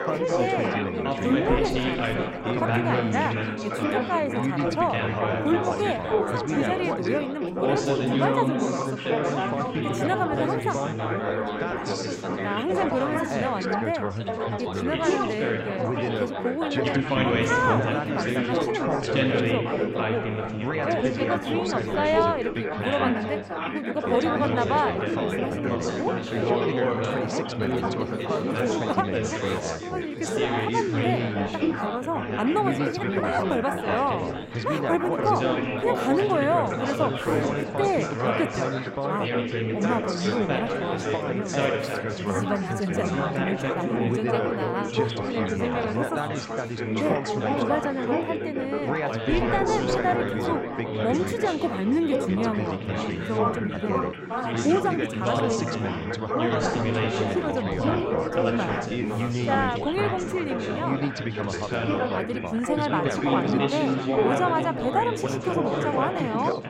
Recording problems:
chatter from many people; very loud; throughout; 2 dB above the speech

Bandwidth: 16 kHz